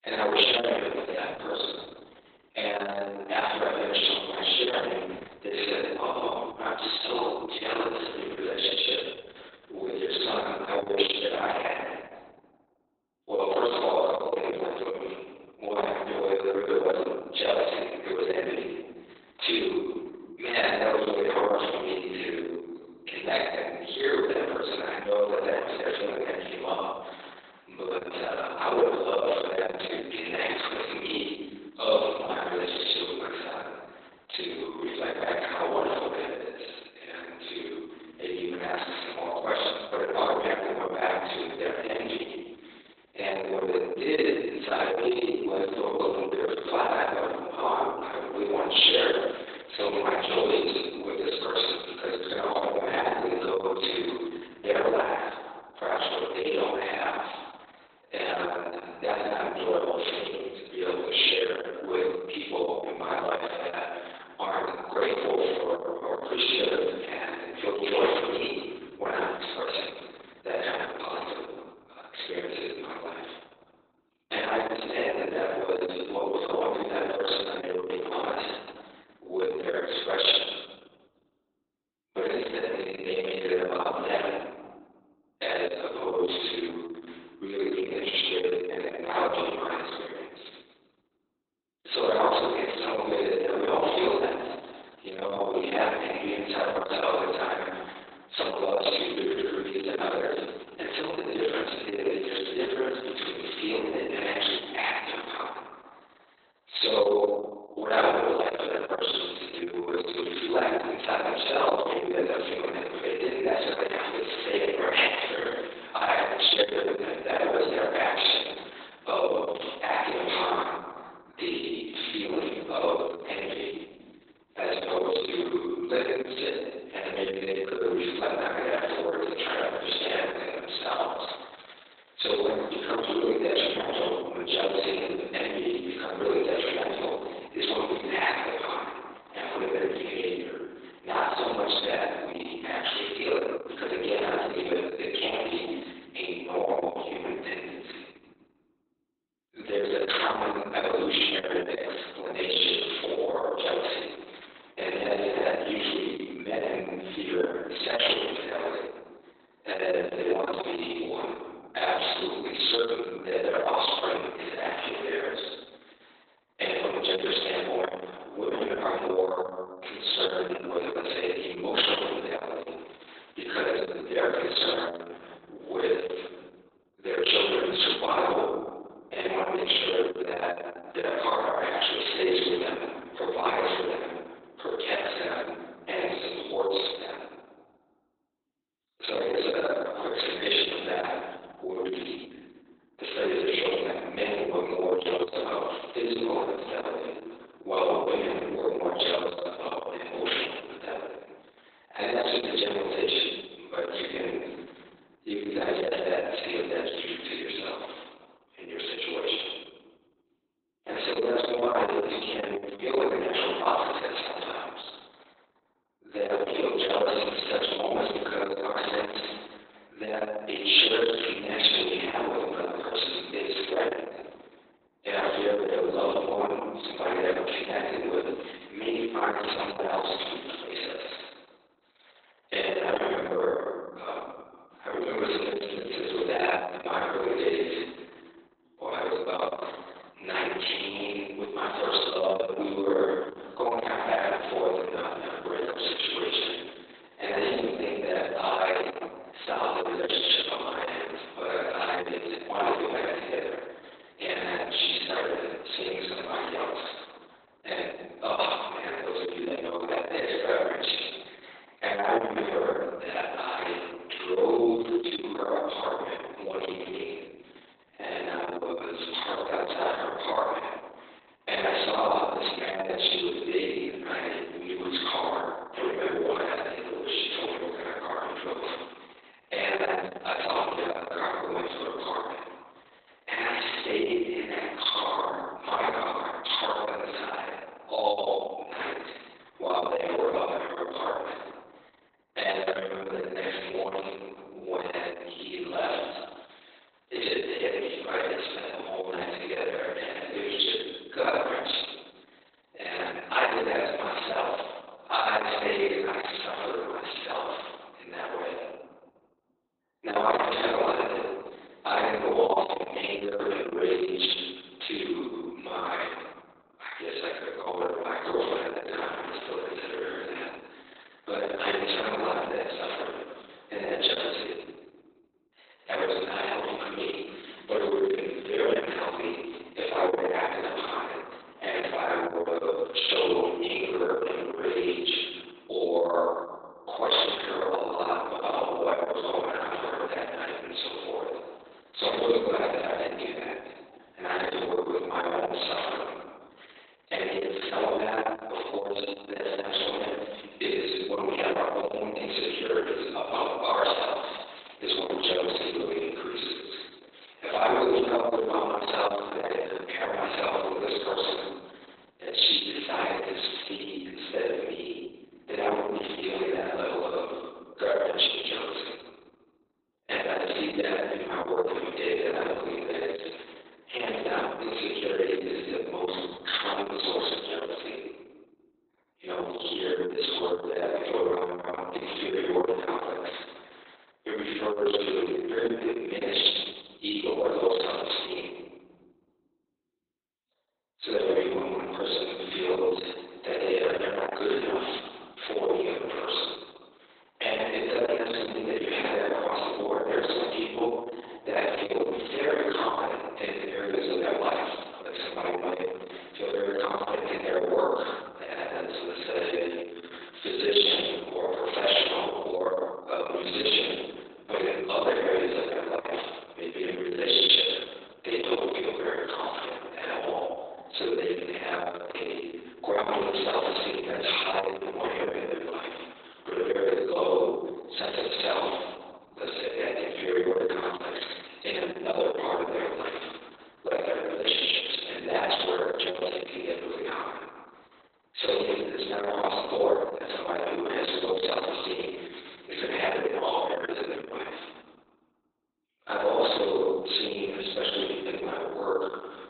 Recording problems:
room echo; strong; dies away in 1.3 s
off-mic speech; far
garbled, watery; badly; nothing above 4 kHz
thin; very; fading below 350 Hz

